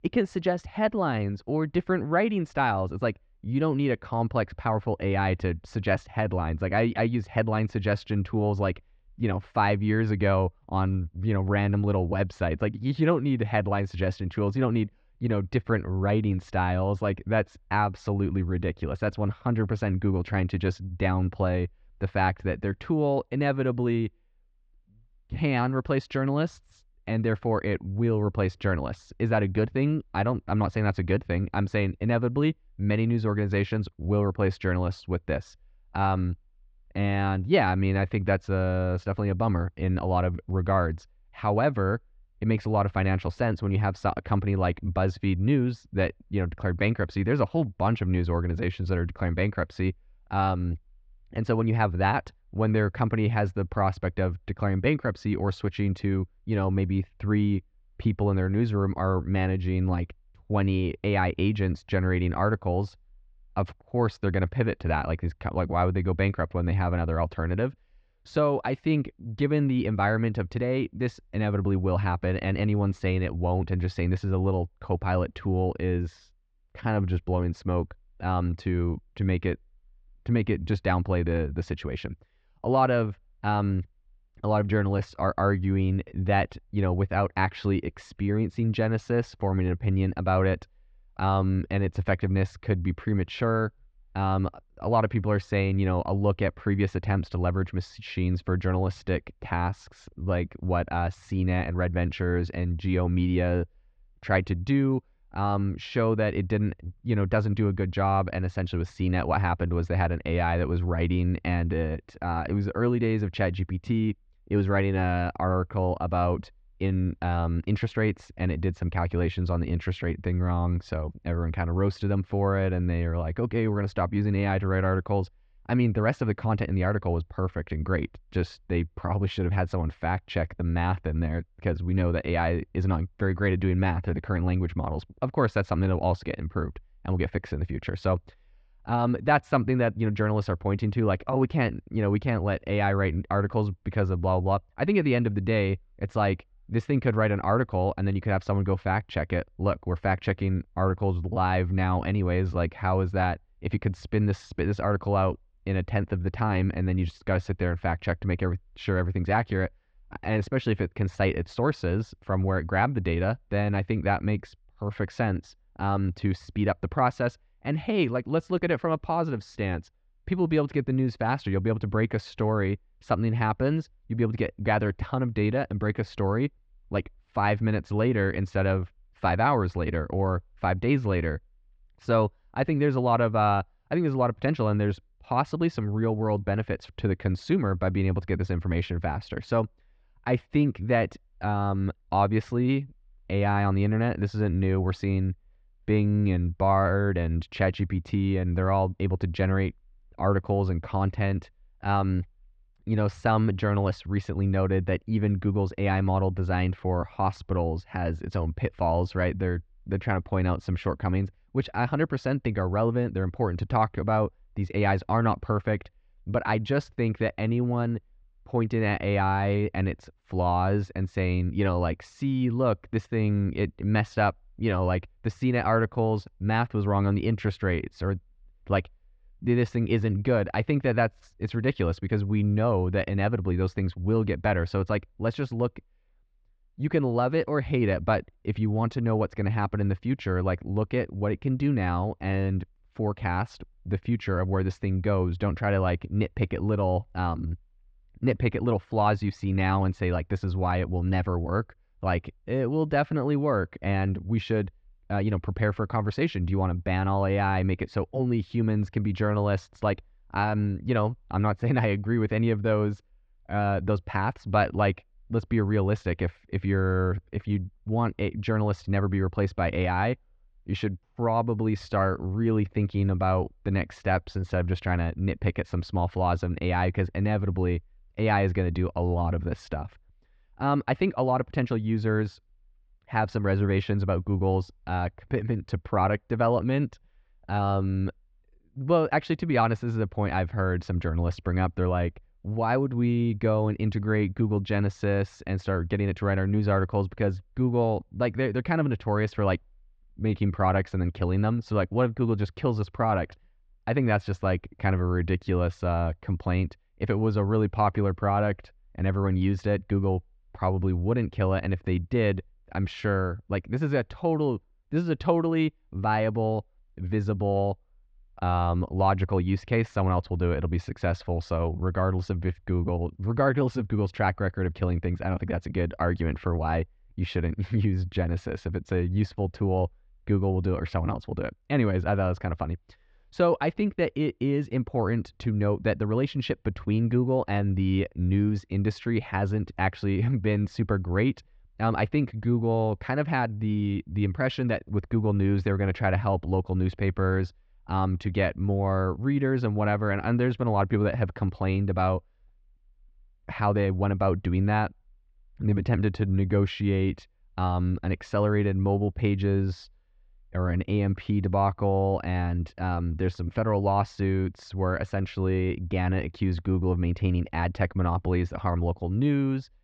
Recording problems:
muffled; slightly; fading above 3.5 kHz

